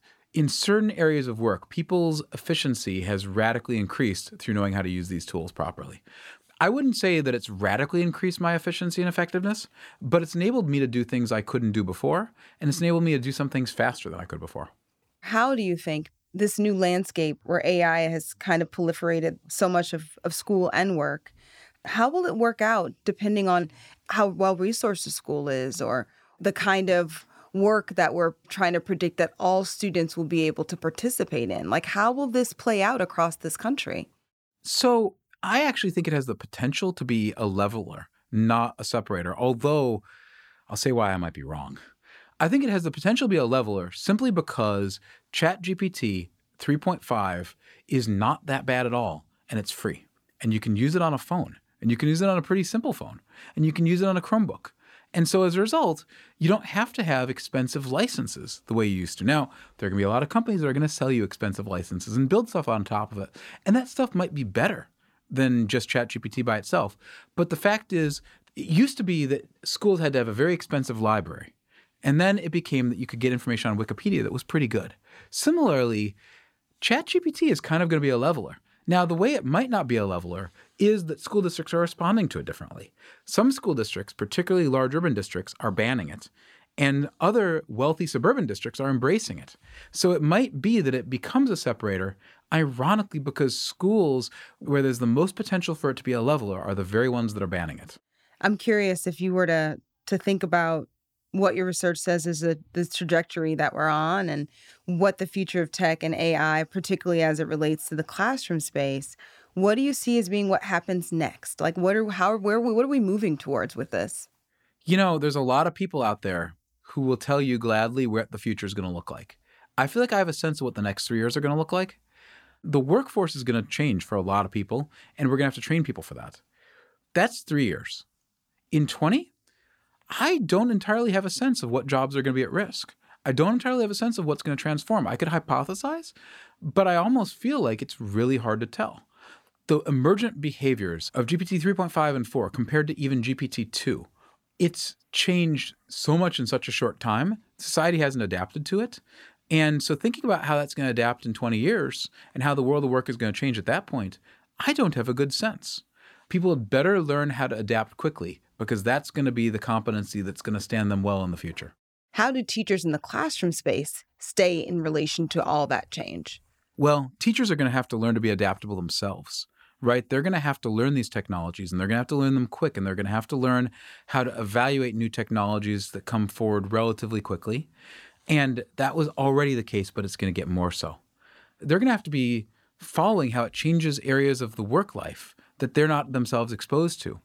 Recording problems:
none

